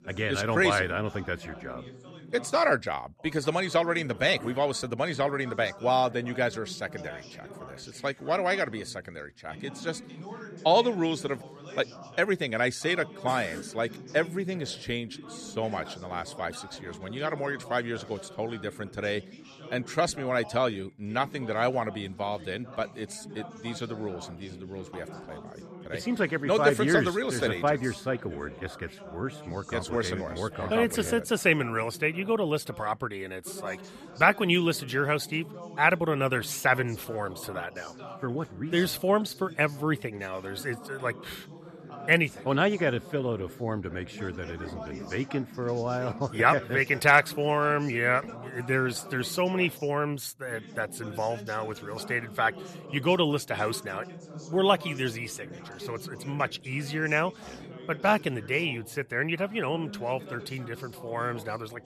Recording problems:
background chatter; noticeable; throughout; 2 voices, 15 dB below the speech

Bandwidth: 13.5 kHz